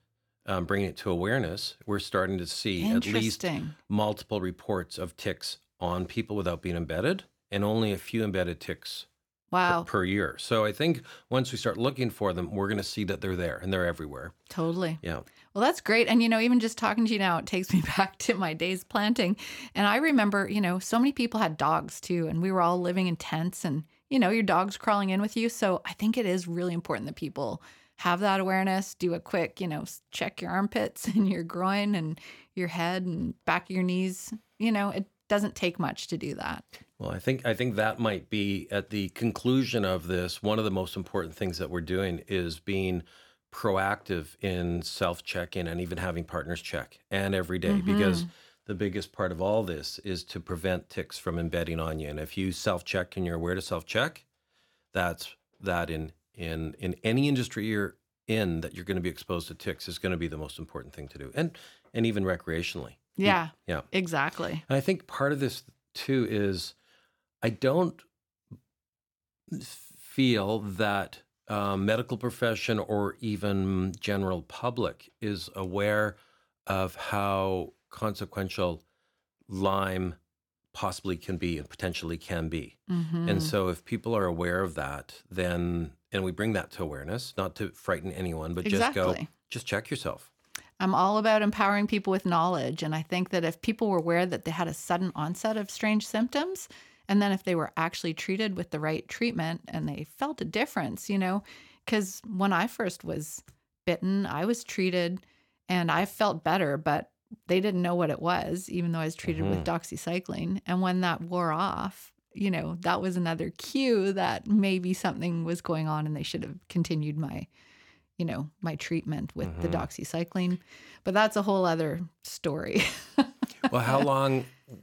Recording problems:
none

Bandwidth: 18 kHz